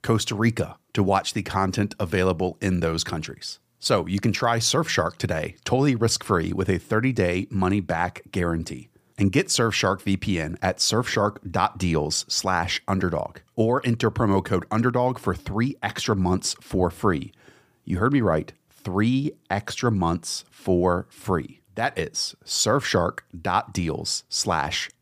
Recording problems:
none

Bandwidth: 15 kHz